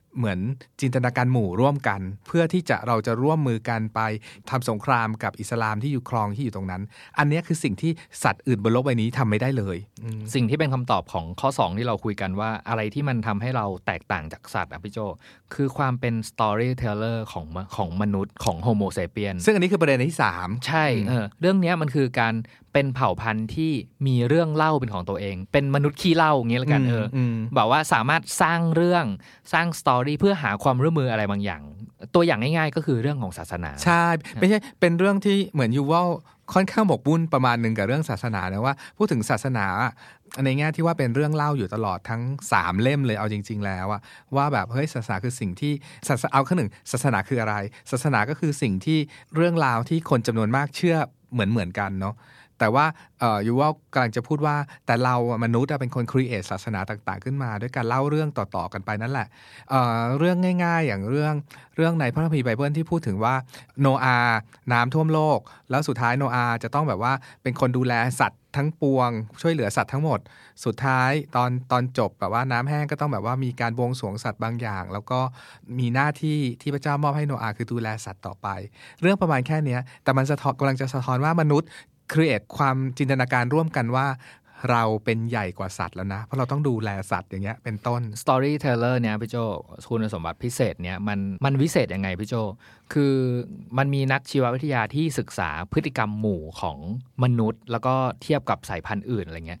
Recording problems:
none

